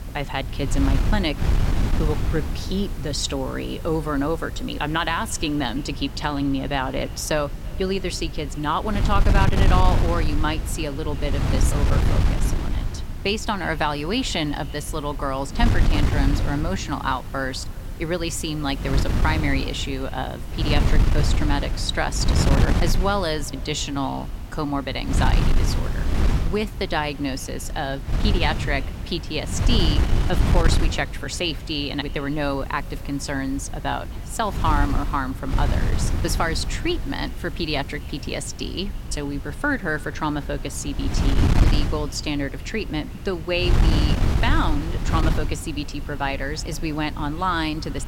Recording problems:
echo of what is said; faint; throughout; 330 ms later, 25 dB below the speech
wind noise on the microphone; heavy; 8 dB below the speech
hiss; faint; throughout; 25 dB below the speech

